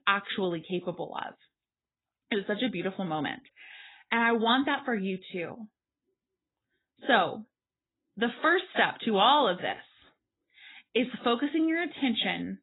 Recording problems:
garbled, watery; badly; nothing above 4 kHz

